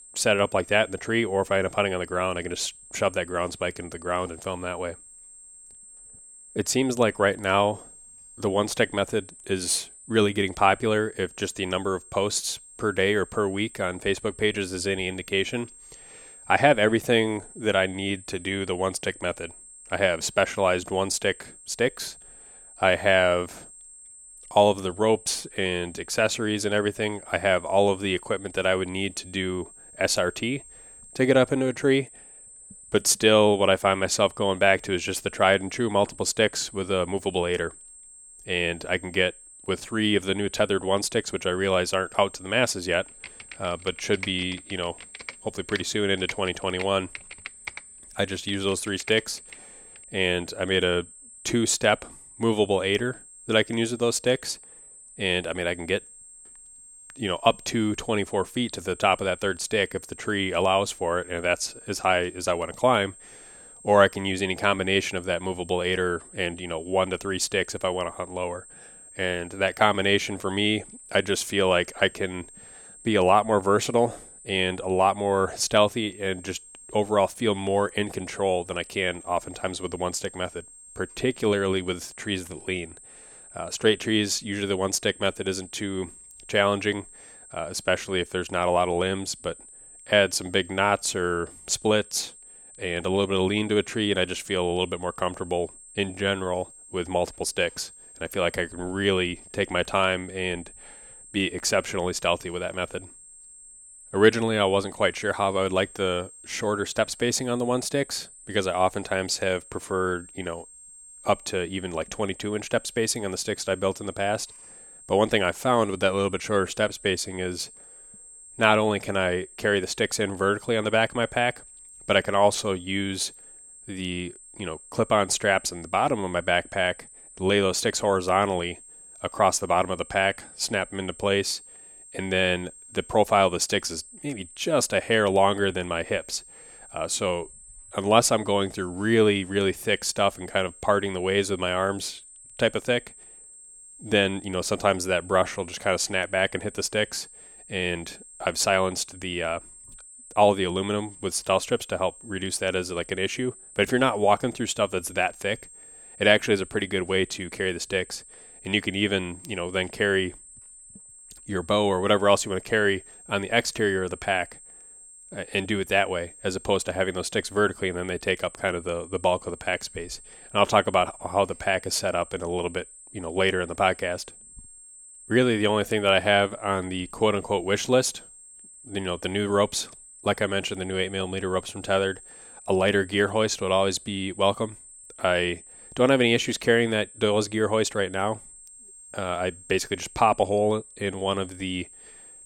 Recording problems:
high-pitched whine; noticeable; throughout; 8.5 kHz, 20 dB below the speech
keyboard typing; faint; from 43 to 50 s; peak 10 dB below the speech

